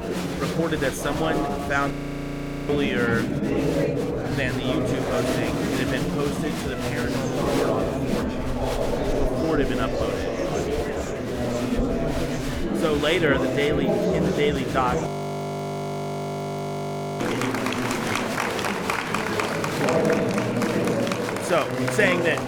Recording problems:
murmuring crowd; very loud; throughout; 2 dB above the speech
audio freezing; at 2 s for 1 s and at 15 s for 2 s

